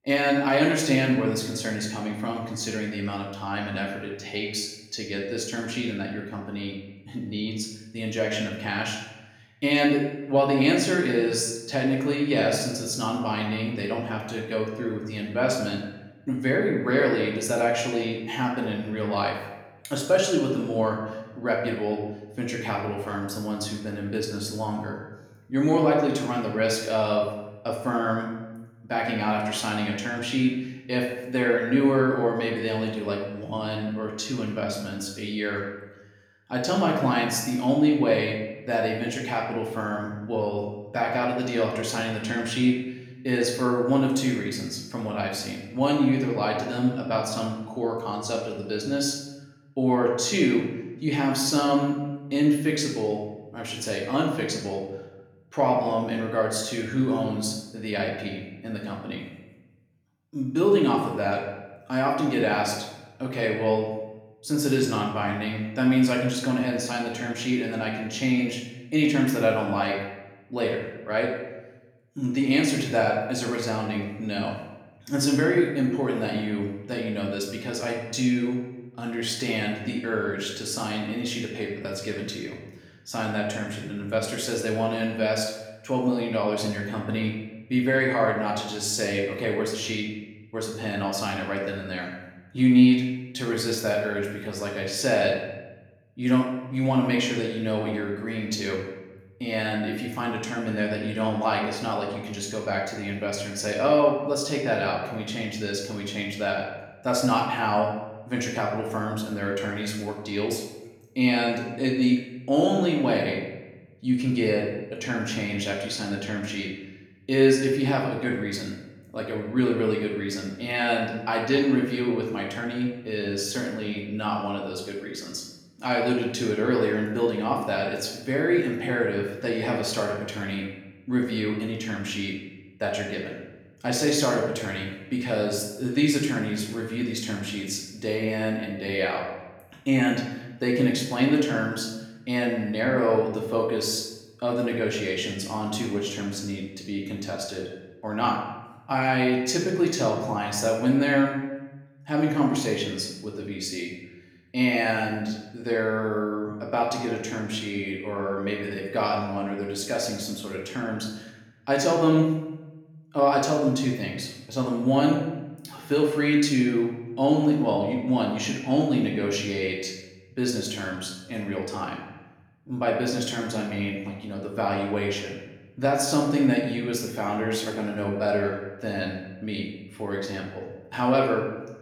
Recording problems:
off-mic speech; far
room echo; noticeable; dies away in 0.9 s

